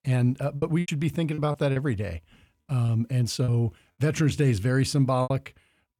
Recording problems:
choppy; very; 8% of the speech affected

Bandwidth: 18 kHz